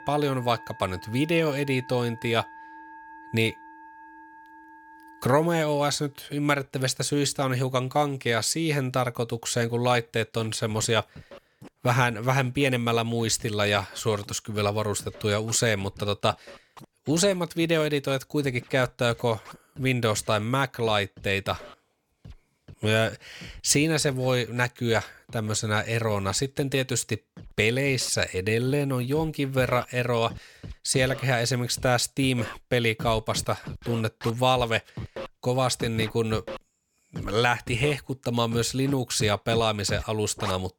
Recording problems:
background music; noticeable; throughout; 20 dB below the speech

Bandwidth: 17.5 kHz